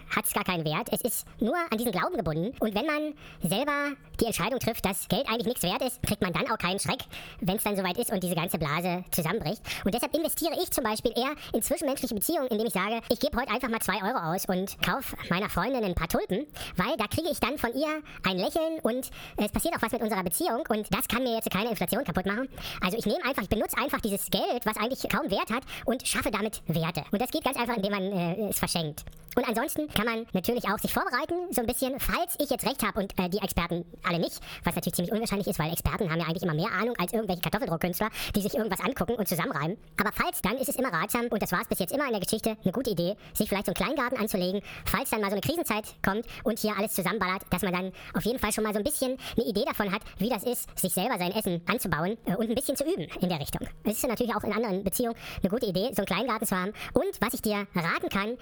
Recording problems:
wrong speed and pitch; too fast and too high; 1.6 times normal speed
squashed, flat; somewhat

